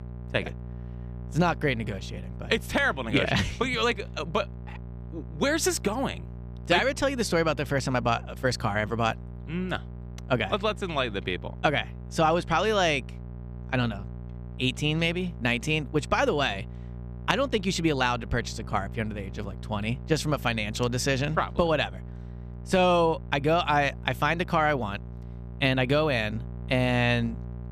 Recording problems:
electrical hum; faint; throughout; 60 Hz, 25 dB below the speech

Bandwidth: 14.5 kHz